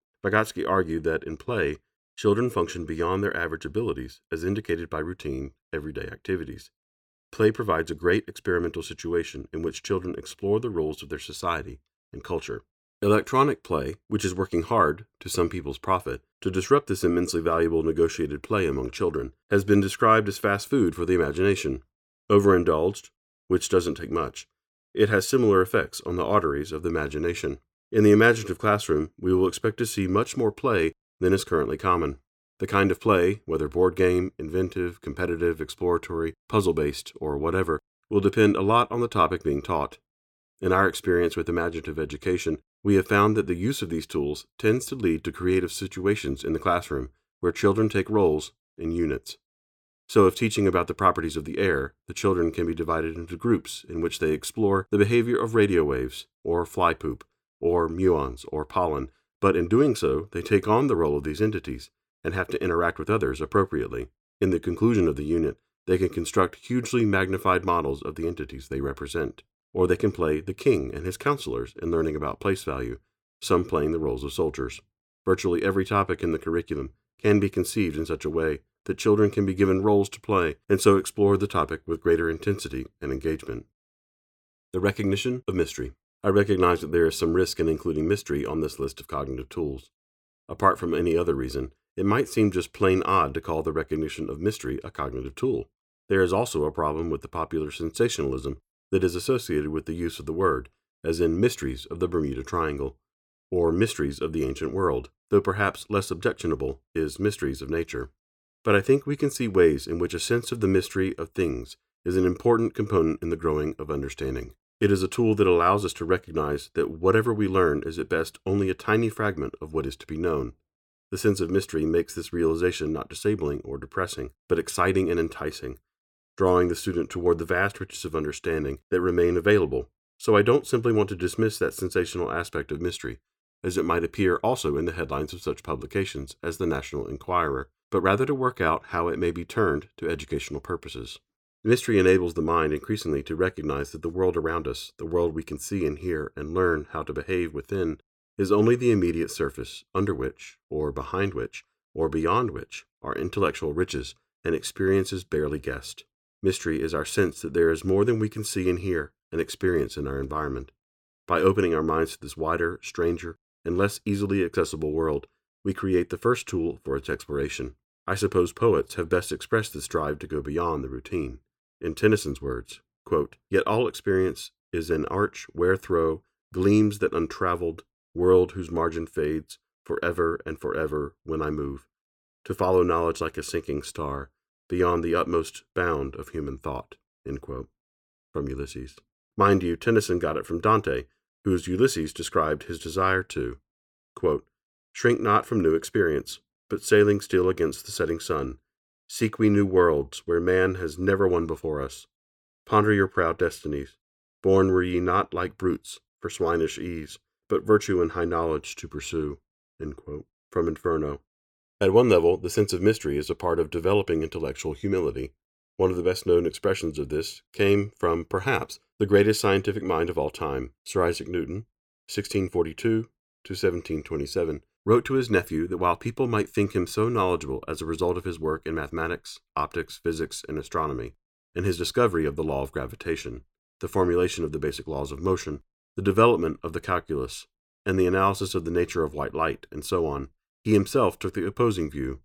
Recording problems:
none

